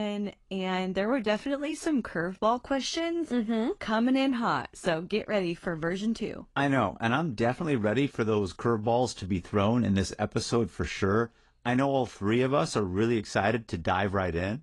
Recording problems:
garbled, watery; slightly; nothing above 10.5 kHz
abrupt cut into speech; at the start

